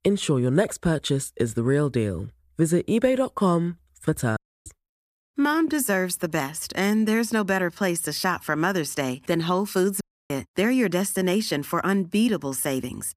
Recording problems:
audio cutting out; at 4.5 s and at 10 s

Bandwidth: 14.5 kHz